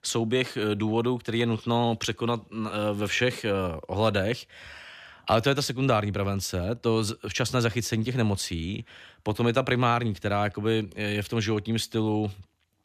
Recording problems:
none

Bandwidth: 14.5 kHz